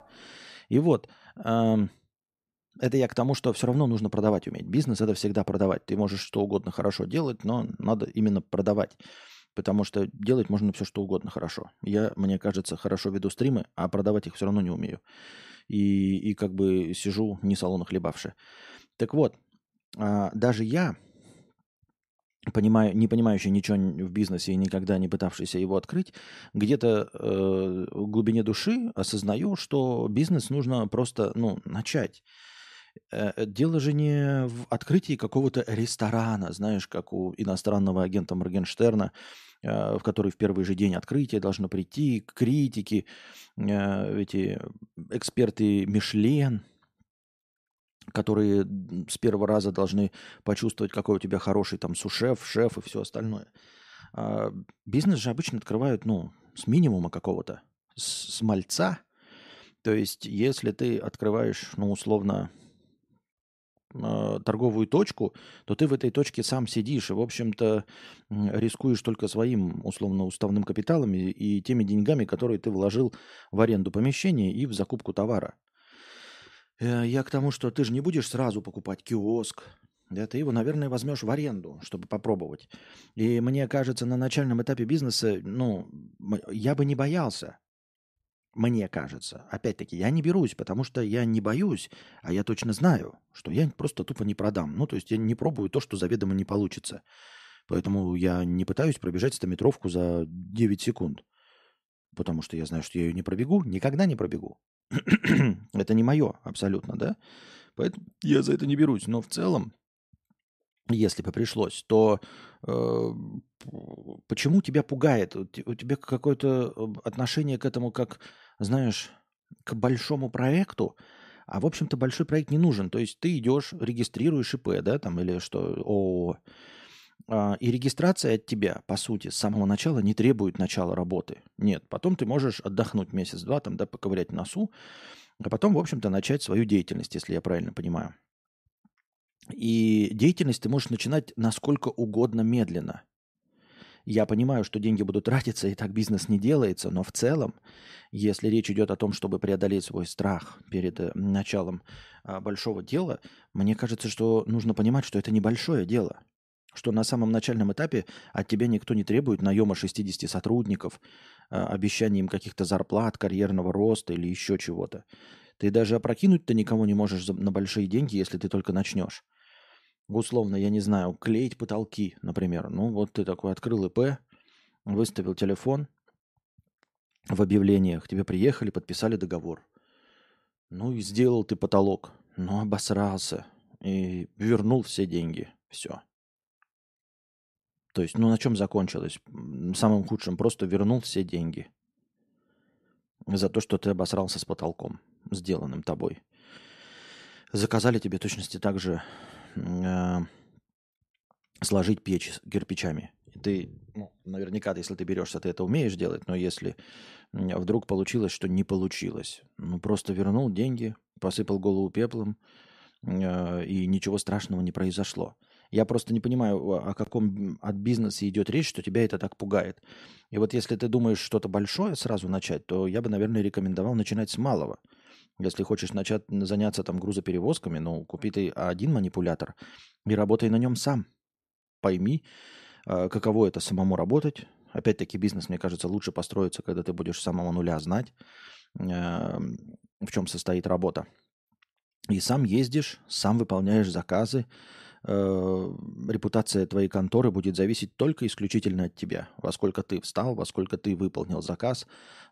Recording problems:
none

